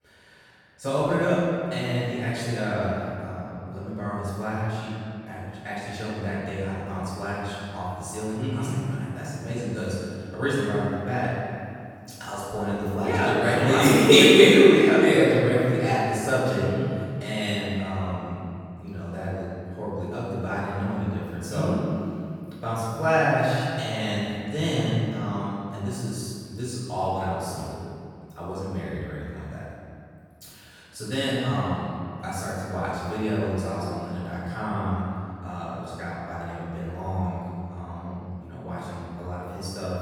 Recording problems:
room echo; strong; dies away in 2.2 s
off-mic speech; far

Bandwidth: 18 kHz